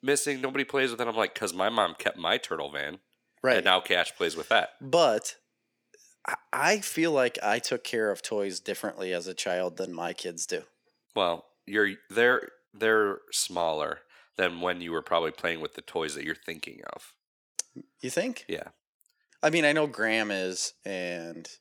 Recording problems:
thin; somewhat; fading below 450 Hz

